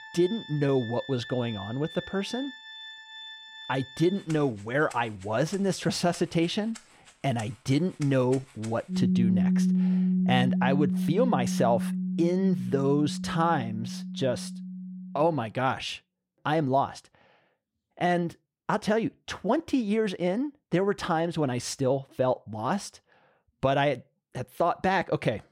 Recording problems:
background music; loud; until 15 s; 2 dB below the speech

